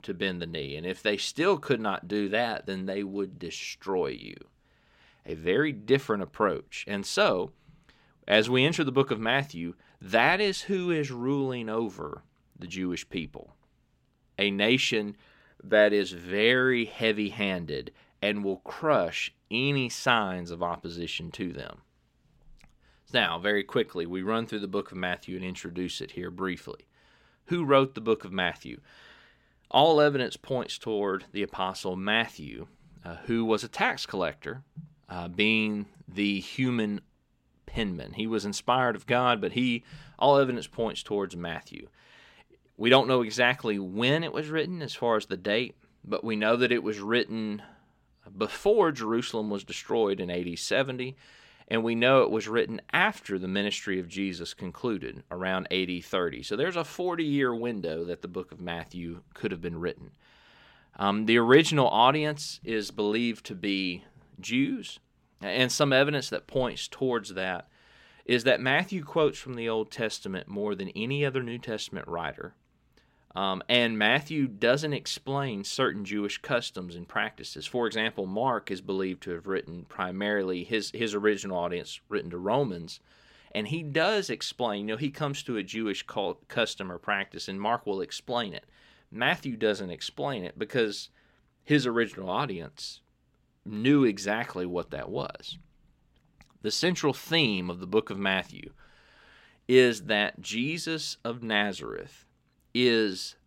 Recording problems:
none

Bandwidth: 16 kHz